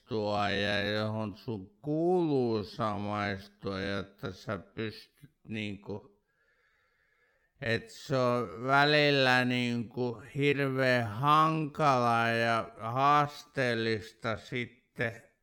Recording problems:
wrong speed, natural pitch; too slow; 0.5 times normal speed

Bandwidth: 17.5 kHz